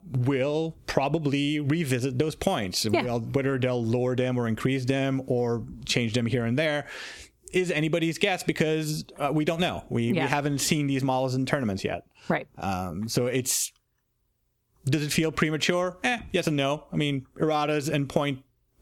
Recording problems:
squashed, flat; heavily

